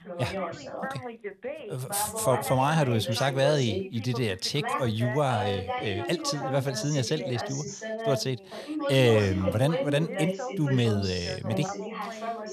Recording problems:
background chatter; loud; throughout; 2 voices, 6 dB below the speech

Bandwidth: 13.5 kHz